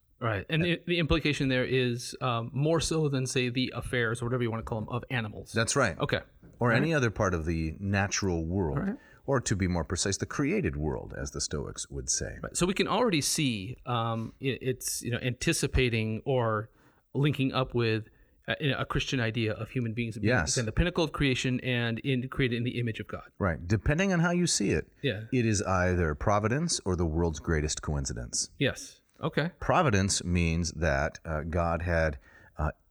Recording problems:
none

